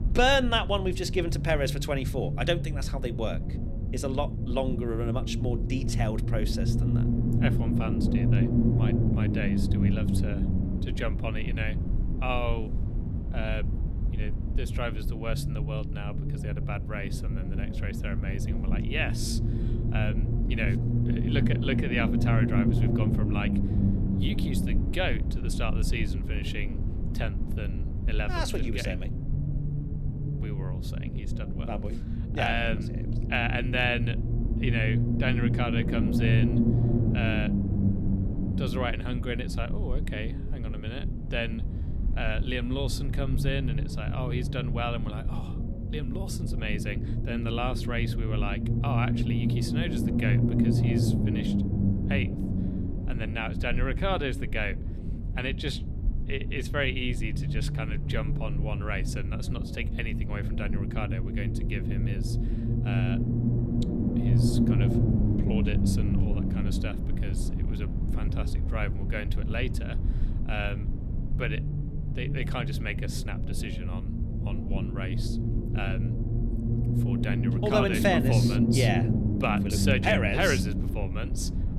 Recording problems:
low rumble; loud; throughout; 5 dB below the speech

